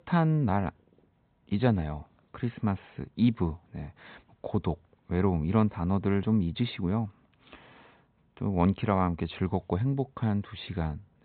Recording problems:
high frequencies cut off; severe; nothing above 4 kHz

